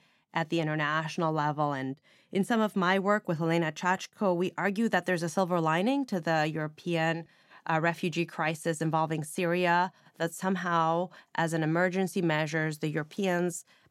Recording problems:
none

